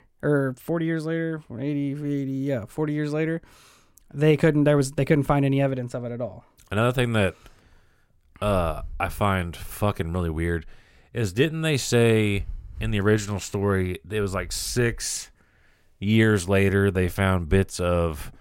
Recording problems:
none

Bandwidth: 16 kHz